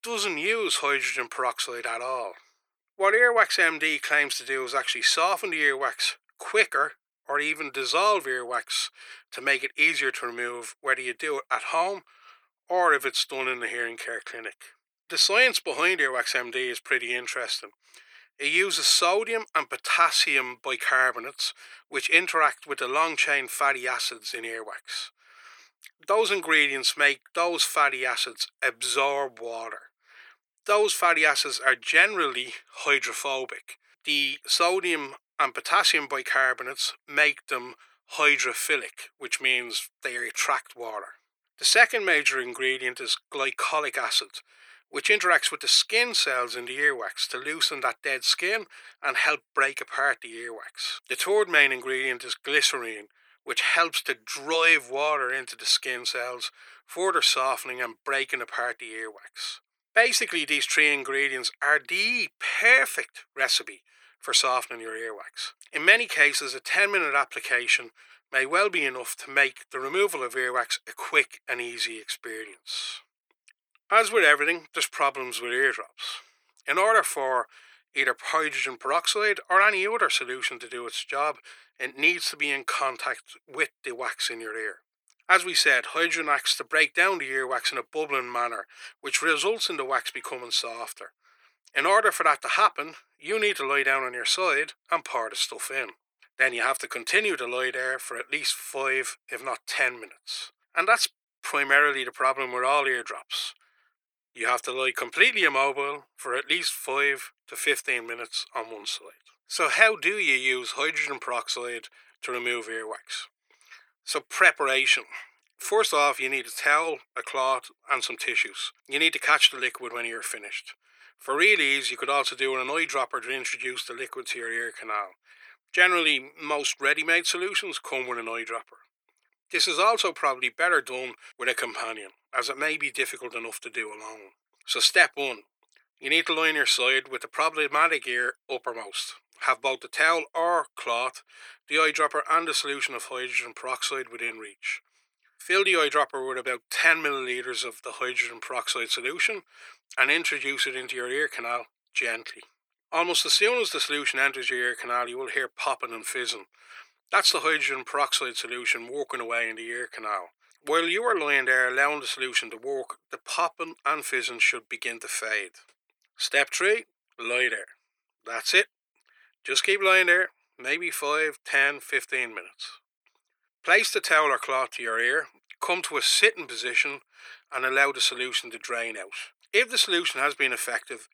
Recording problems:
thin; very; fading below 400 Hz

